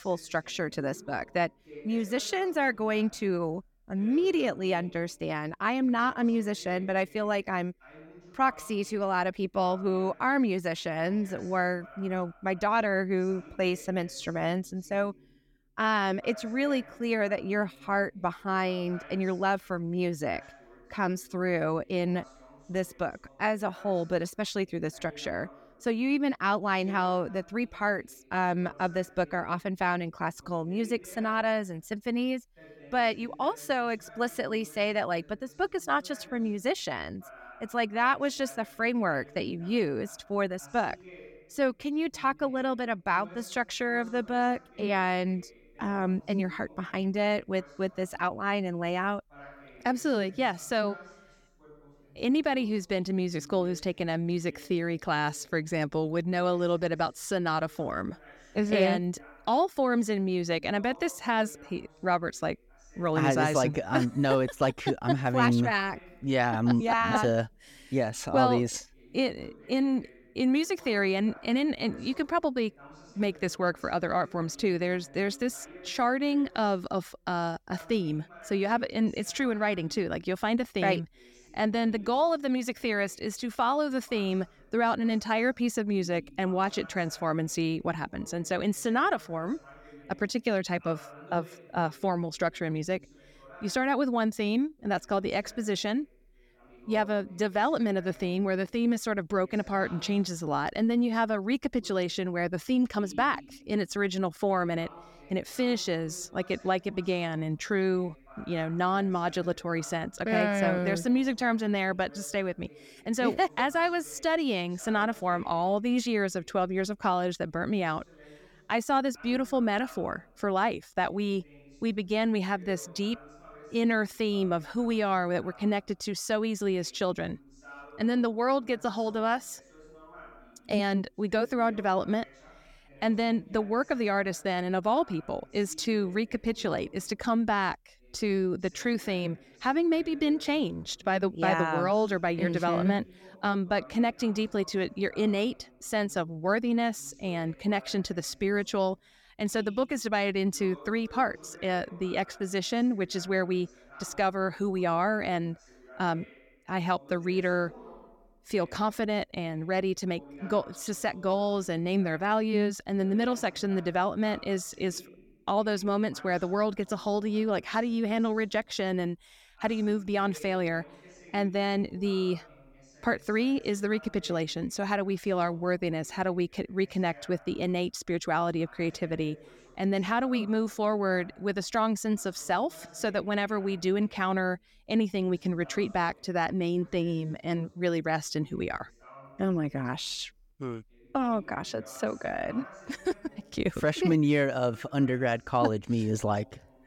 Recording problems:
voice in the background; faint; throughout; 25 dB below the speech

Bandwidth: 17 kHz